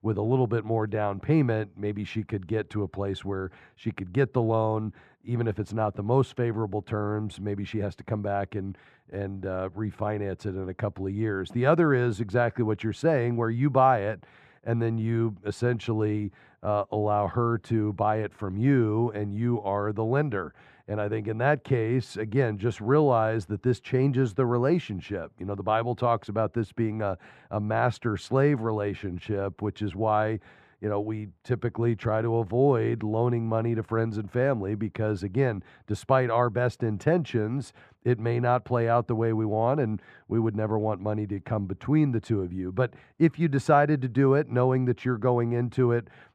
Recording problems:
muffled; very; fading above 3 kHz

